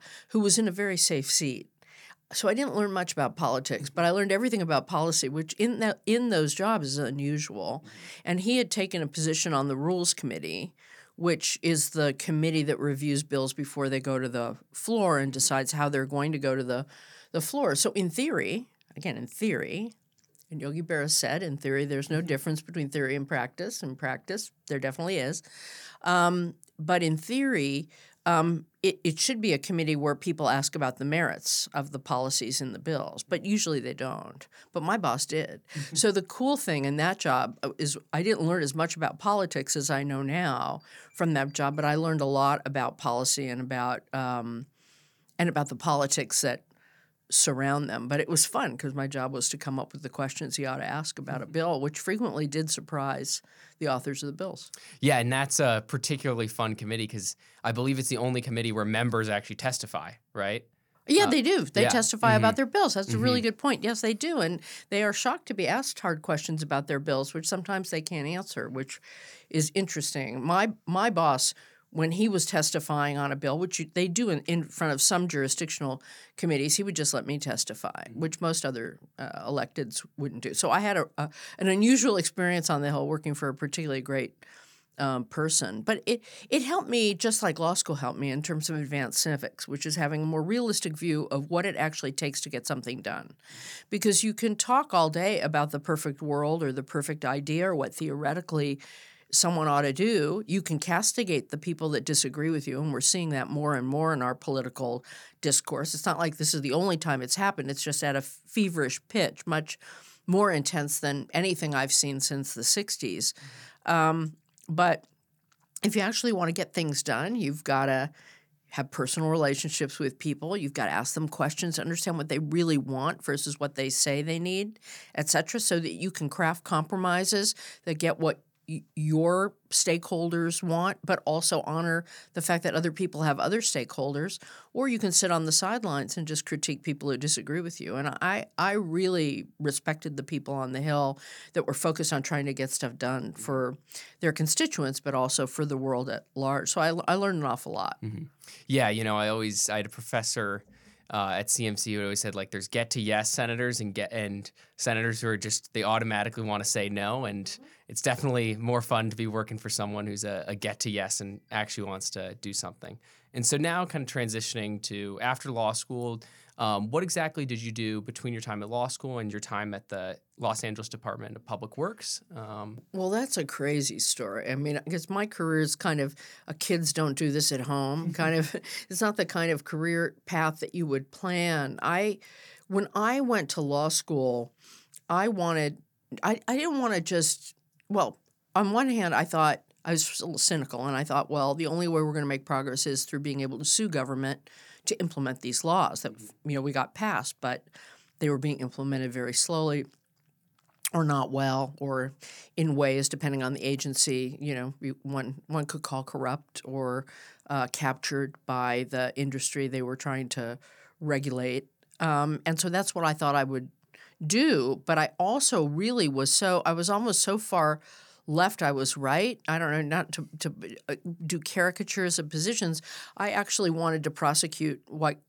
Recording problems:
none

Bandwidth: 18.5 kHz